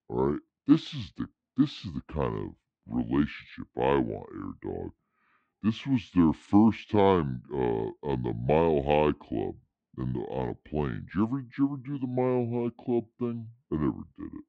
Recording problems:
wrong speed and pitch; too slow and too low; 0.7 times normal speed
muffled; slightly; fading above 2.5 kHz

